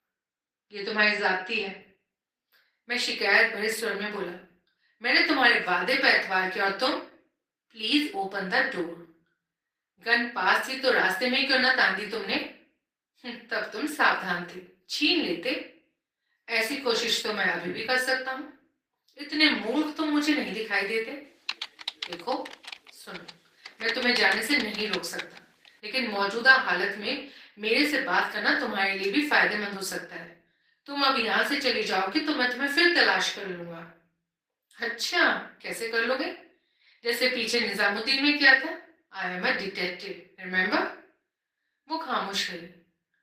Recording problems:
off-mic speech; far
thin; somewhat; fading below 300 Hz
room echo; slight; dies away in 0.4 s
garbled, watery; slightly; nothing above 15 kHz
keyboard typing; noticeable; from 21 to 25 s; peak 7 dB below the speech

